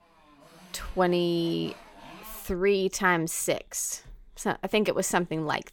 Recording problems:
traffic noise; faint; throughout; 20 dB below the speech

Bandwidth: 17 kHz